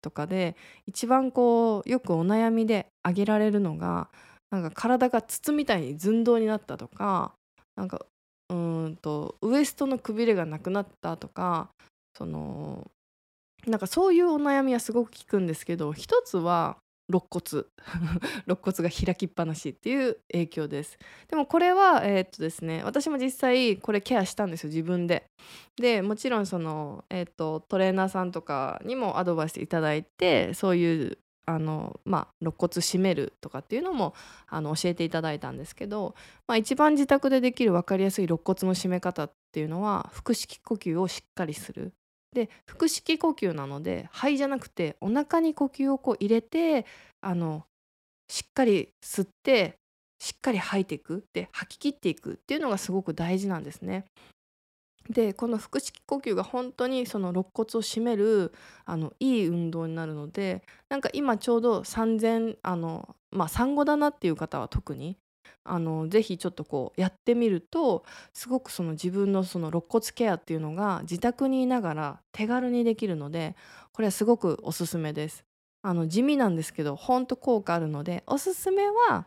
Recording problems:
none

